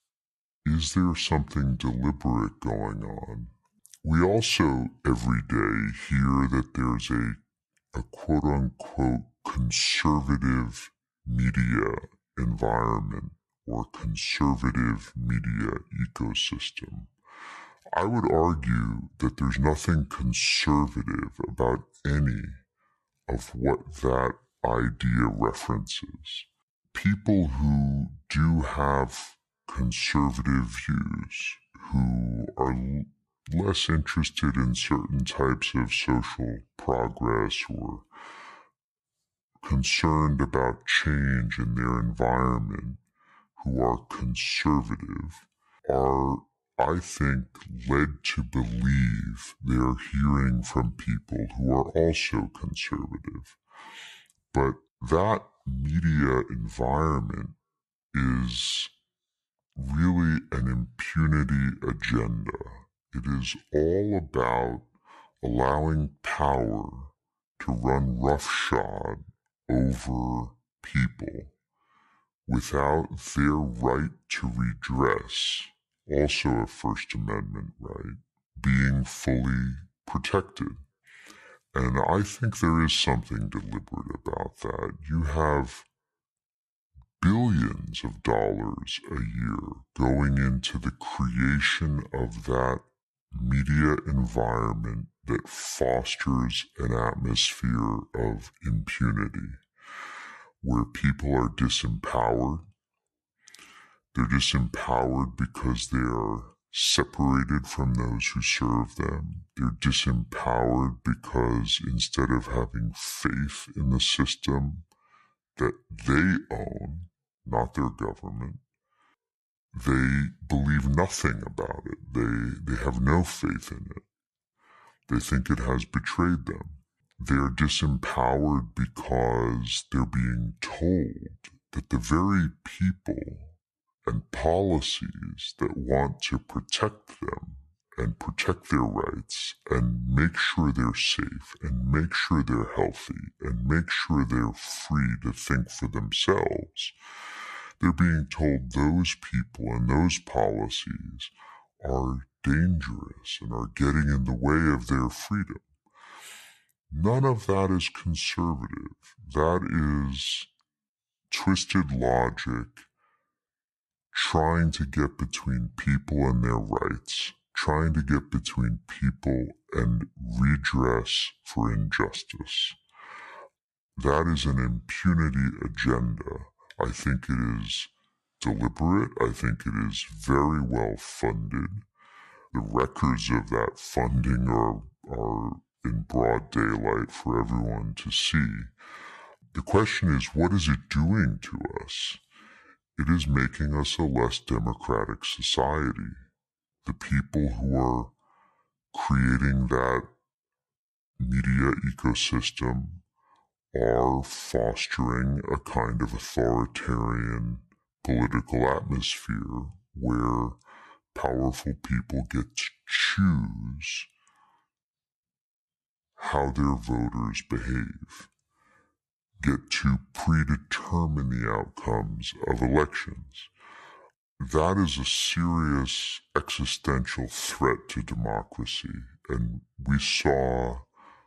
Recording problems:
wrong speed and pitch; too slow and too low; 0.7 times normal speed

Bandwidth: 12.5 kHz